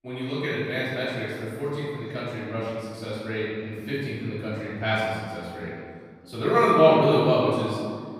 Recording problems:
room echo; strong; dies away in 1.8 s
off-mic speech; far
voice in the background; faint; throughout; 30 dB below the speech

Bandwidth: 15 kHz